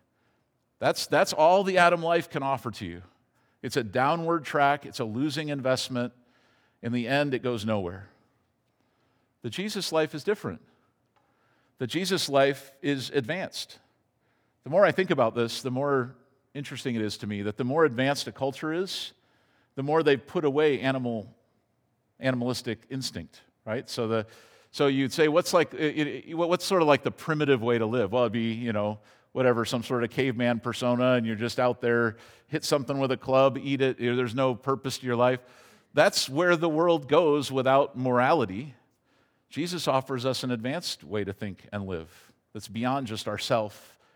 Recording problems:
none

